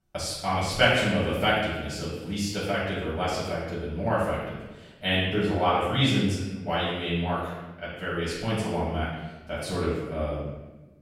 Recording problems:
room echo; strong; dies away in 1 s
off-mic speech; far

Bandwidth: 16 kHz